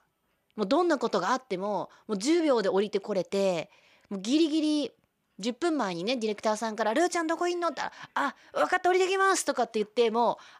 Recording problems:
none

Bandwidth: 15 kHz